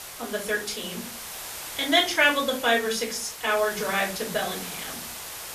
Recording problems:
off-mic speech; far
room echo; very slight; dies away in 0.3 s
hiss; noticeable; throughout; 10 dB below the speech

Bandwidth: 14.5 kHz